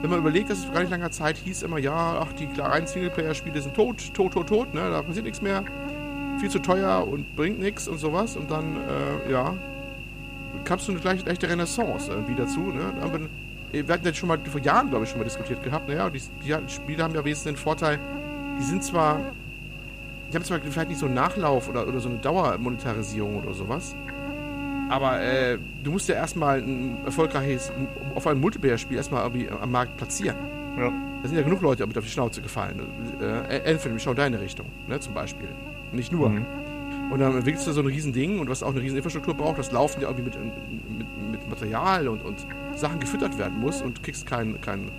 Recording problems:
electrical hum; loud; throughout; 50 Hz, 8 dB below the speech

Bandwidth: 14.5 kHz